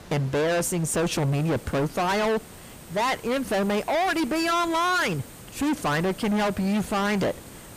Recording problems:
distortion; heavy; 31% of the sound clipped
hiss; noticeable; throughout; 20 dB below the speech

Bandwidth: 15 kHz